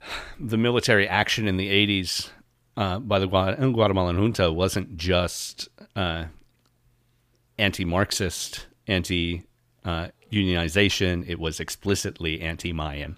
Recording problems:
none

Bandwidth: 15 kHz